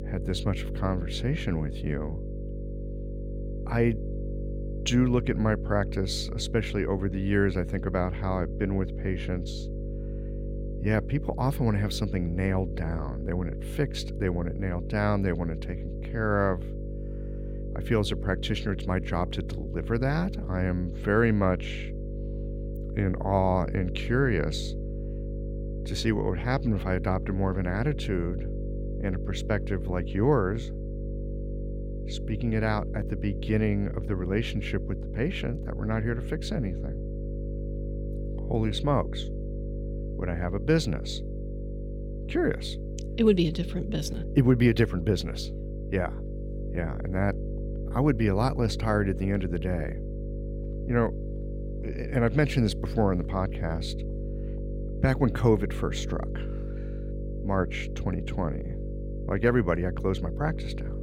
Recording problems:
electrical hum; noticeable; throughout; 50 Hz, 10 dB below the speech

